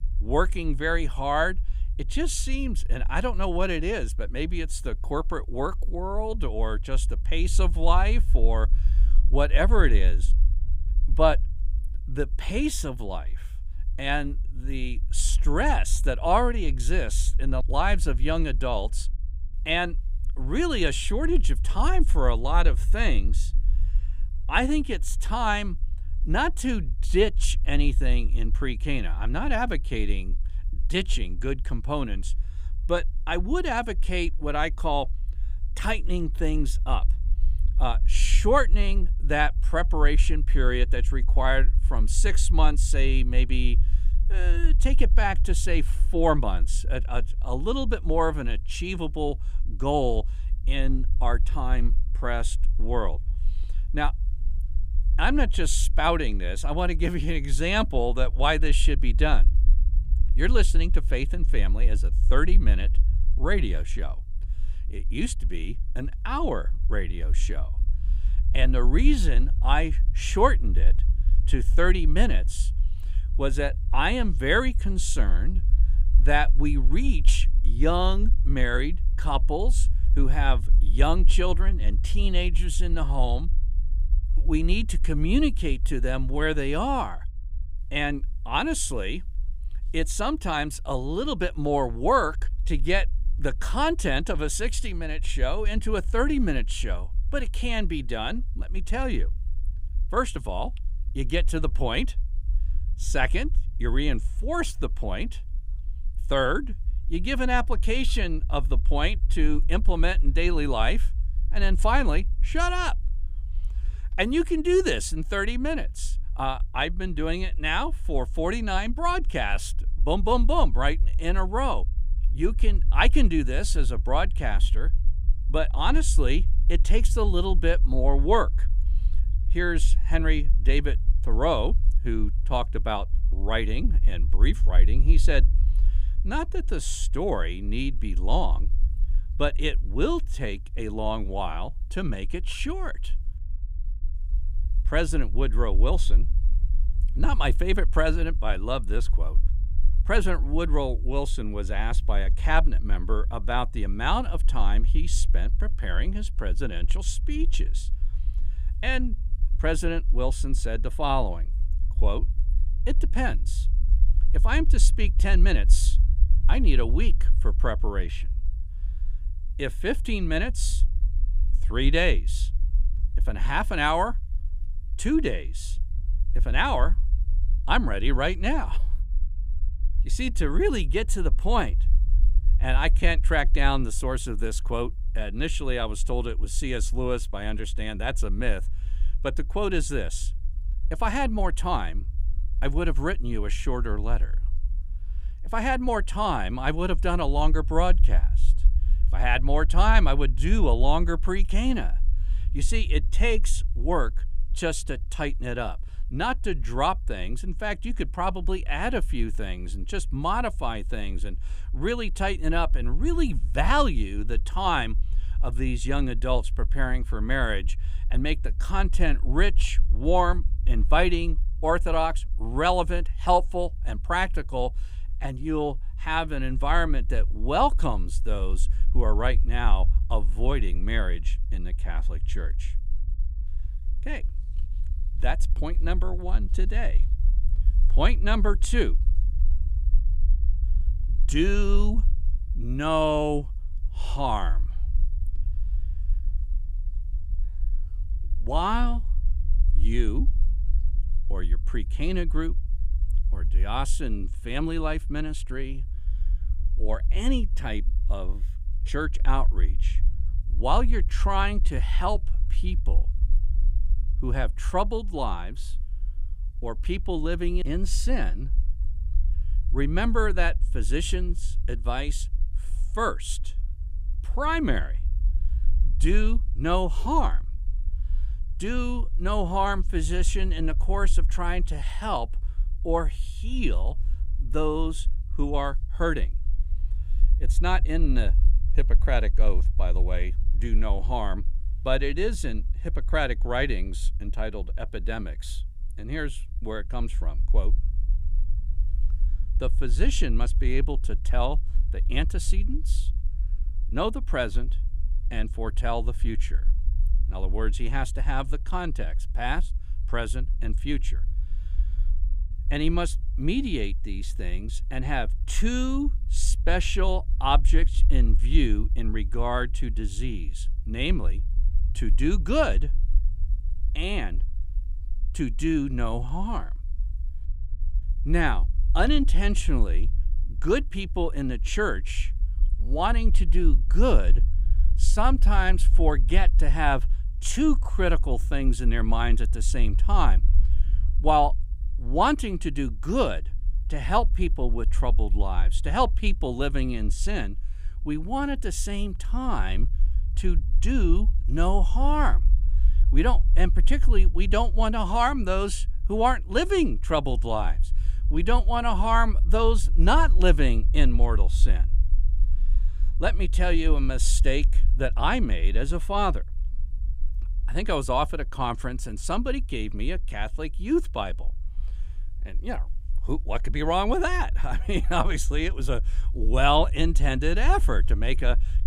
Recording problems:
low rumble; faint; throughout; 25 dB below the speech

